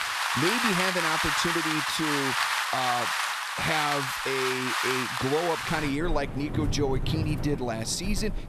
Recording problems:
rain or running water; very loud; throughout; 2 dB above the speech

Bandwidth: 14 kHz